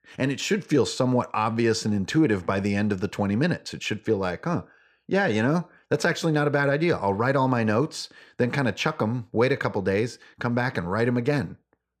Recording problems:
none

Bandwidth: 14.5 kHz